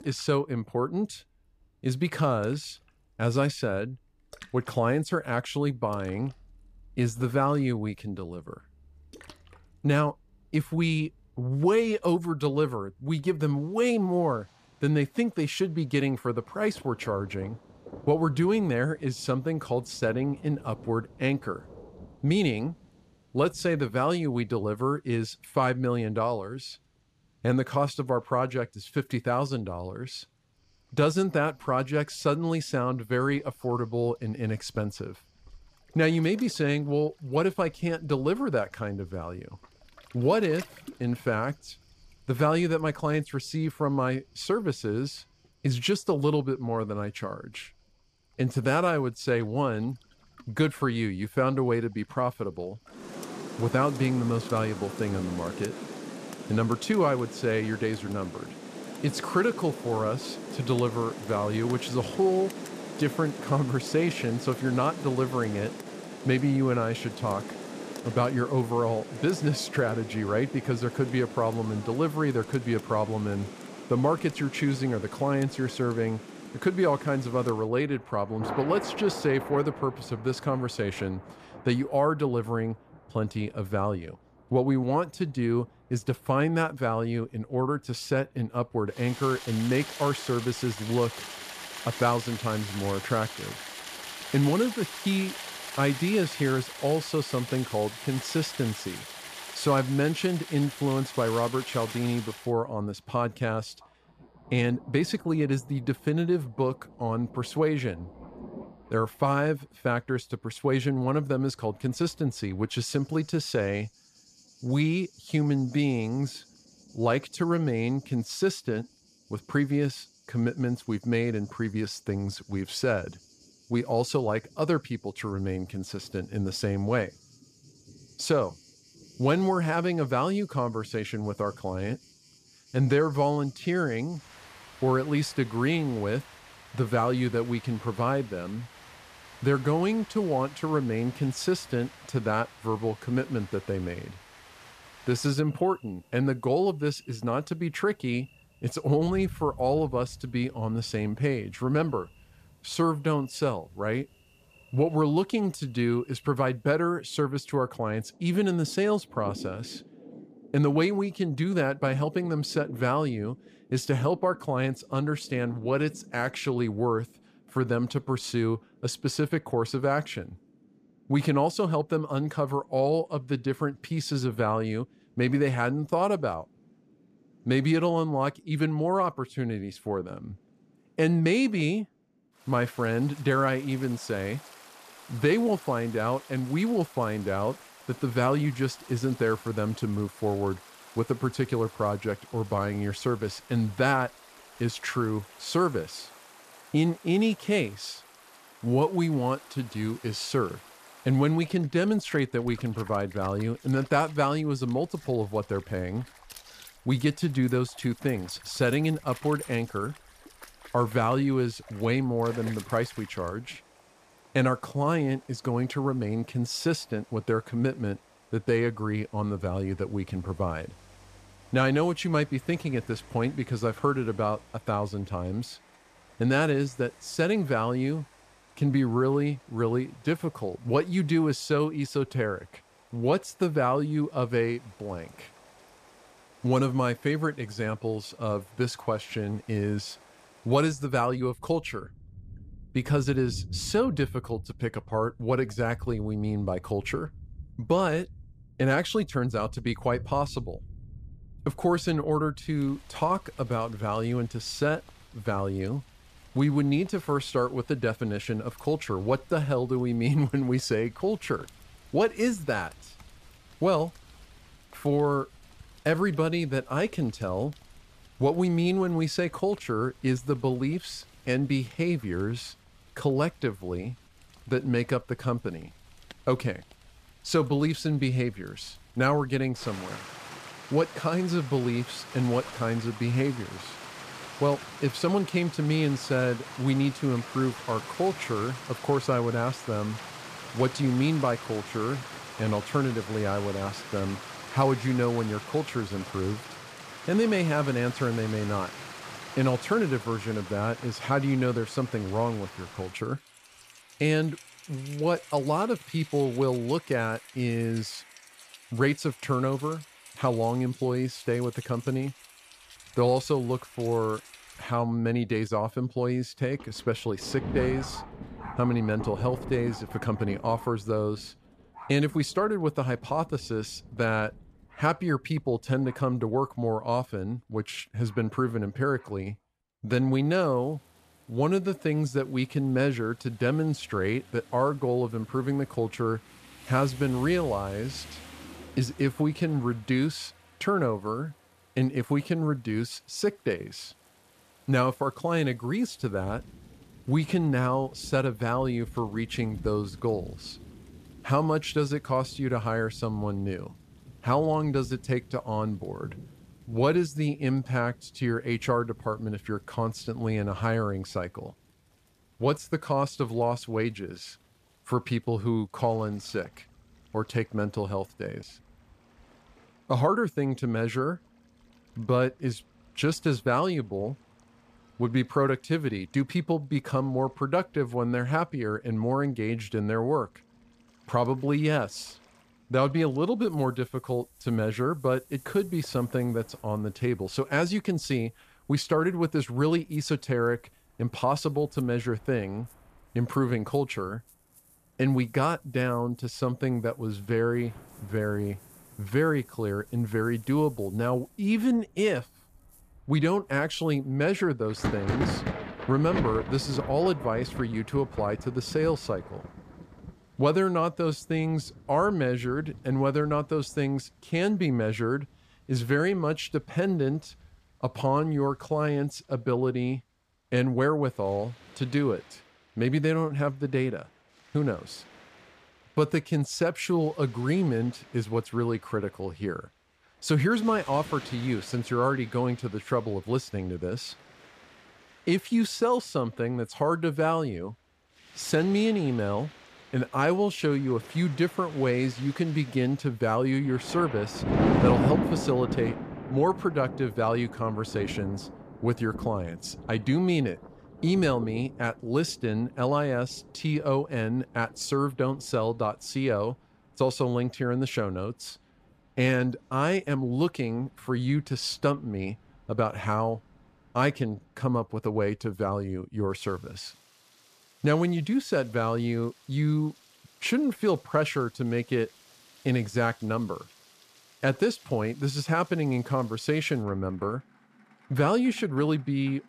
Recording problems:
rain or running water; noticeable; throughout; 15 dB below the speech

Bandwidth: 14.5 kHz